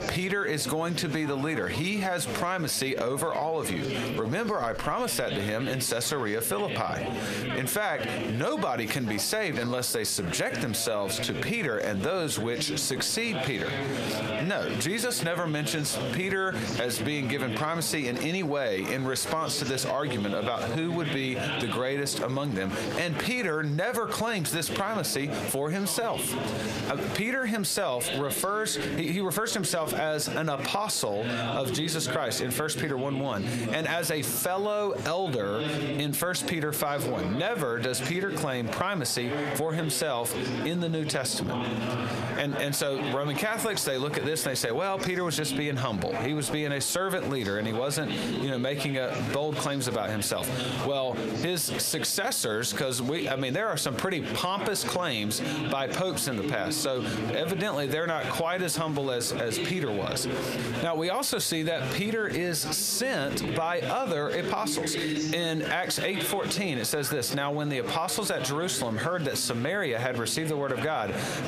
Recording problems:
squashed, flat; heavily, background pumping
murmuring crowd; loud; throughout; 7 dB below the speech

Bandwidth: 15 kHz